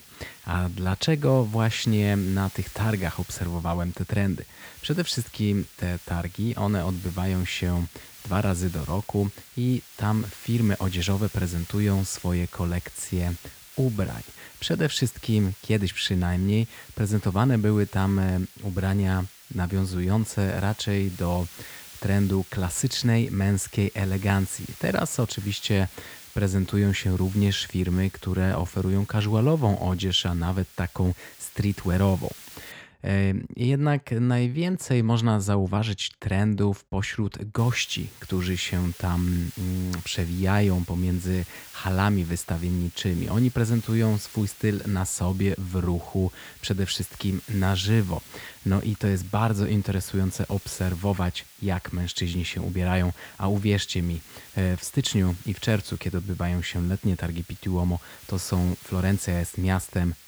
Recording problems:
hiss; noticeable; until 33 s and from 38 s on; 20 dB below the speech

